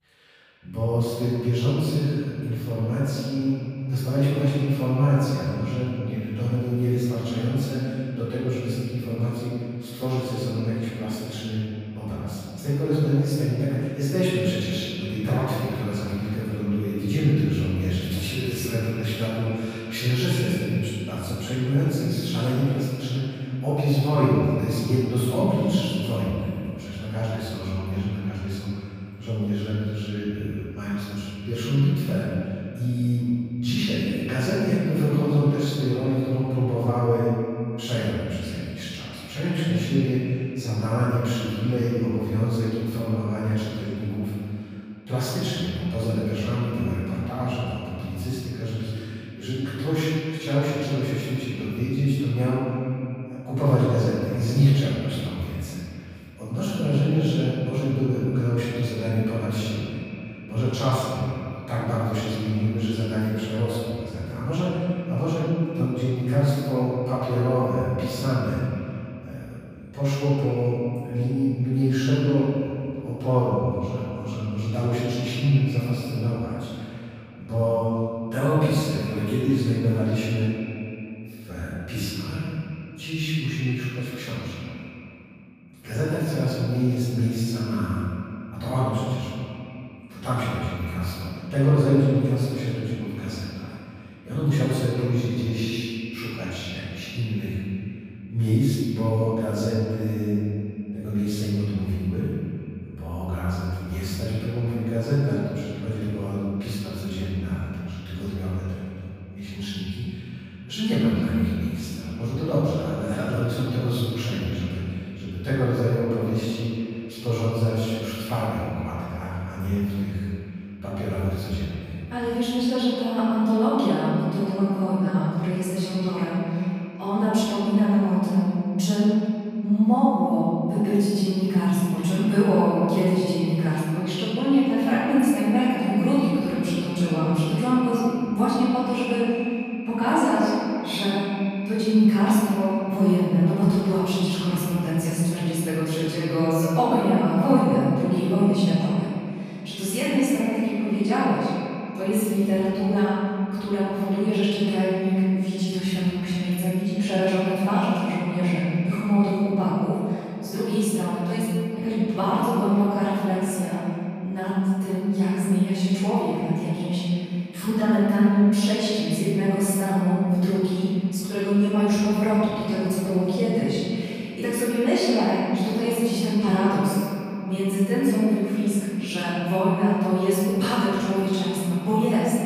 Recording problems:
room echo; strong; dies away in 2.3 s
off-mic speech; far
echo of what is said; noticeable; throughout; 180 ms later, 20 dB below the speech

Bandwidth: 15 kHz